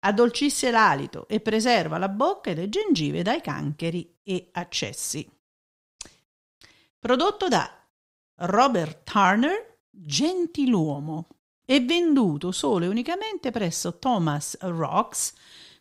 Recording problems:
none

